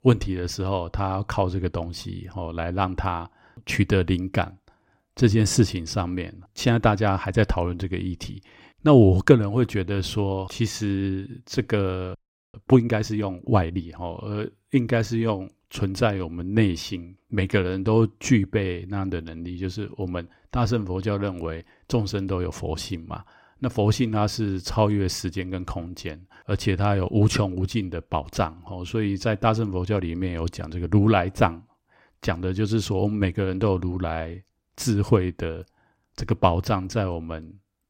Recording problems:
audio freezing; at 12 s

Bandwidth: 16 kHz